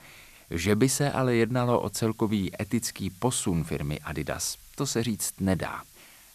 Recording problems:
hiss; faint; throughout; 25 dB below the speech

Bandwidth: 14 kHz